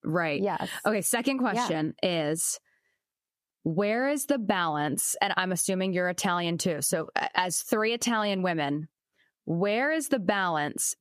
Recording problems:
squashed, flat; heavily

